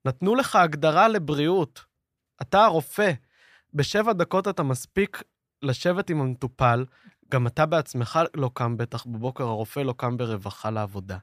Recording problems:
none

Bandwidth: 14.5 kHz